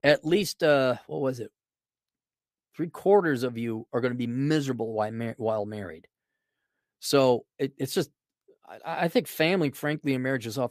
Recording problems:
none

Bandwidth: 14.5 kHz